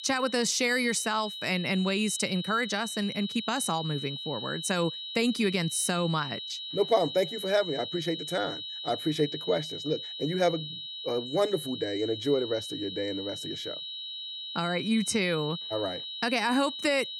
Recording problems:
high-pitched whine; loud; throughout; 4 kHz, 7 dB below the speech

